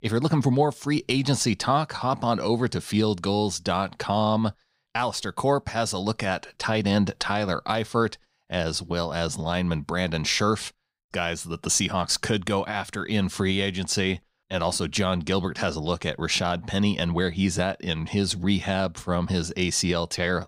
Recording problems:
none

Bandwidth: 15.5 kHz